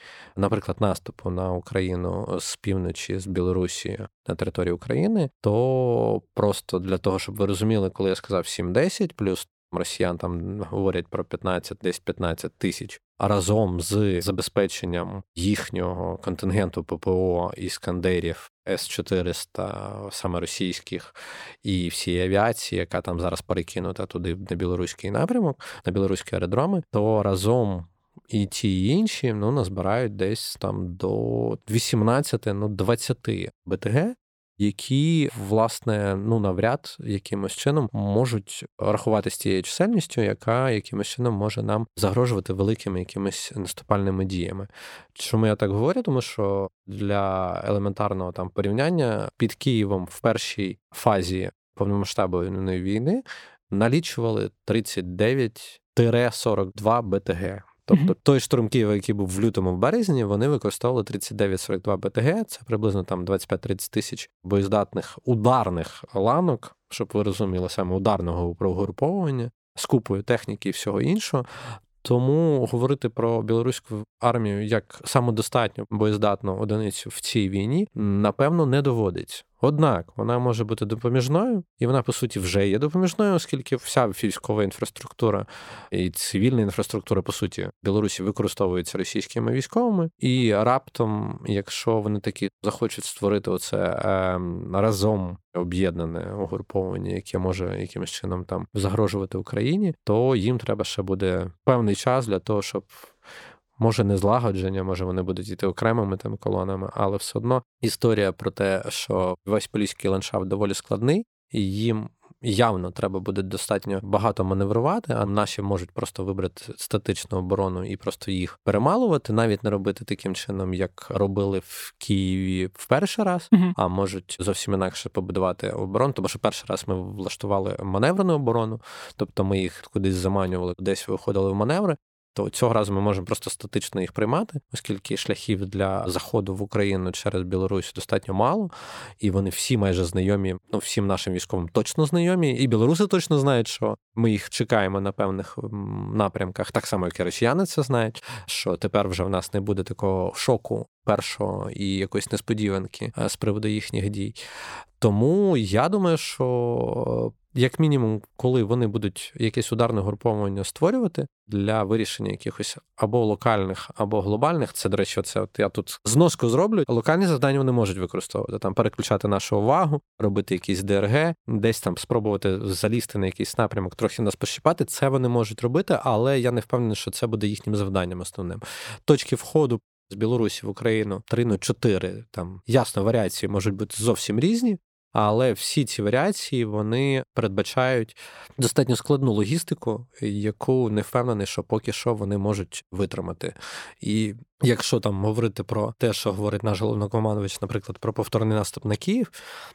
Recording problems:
none

